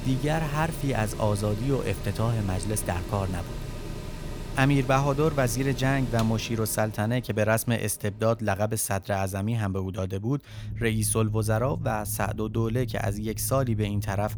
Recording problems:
machinery noise; loud; throughout; 10 dB below the speech

